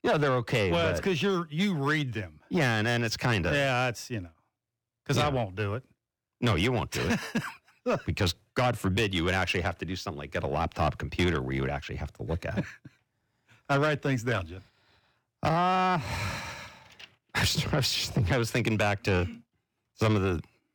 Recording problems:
distortion; slight; 10 dB below the speech

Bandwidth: 18 kHz